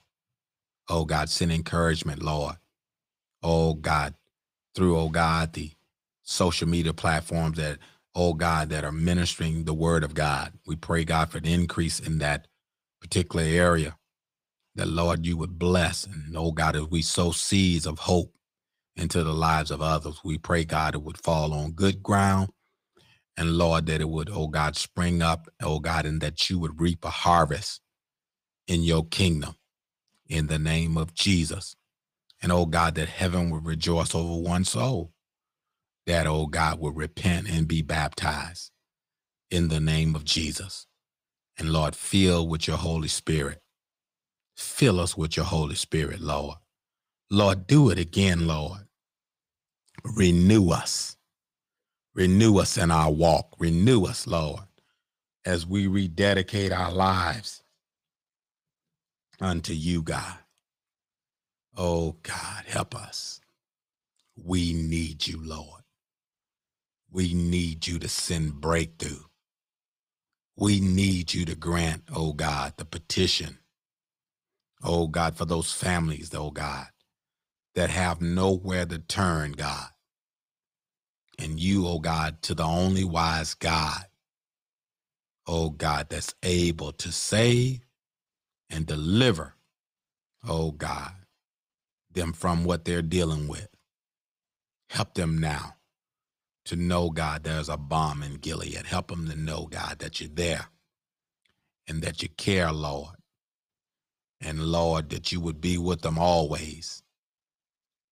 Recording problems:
none

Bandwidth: 15.5 kHz